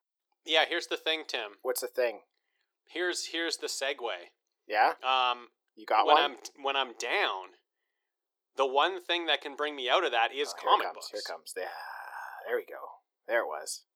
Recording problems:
thin; very; fading below 350 Hz

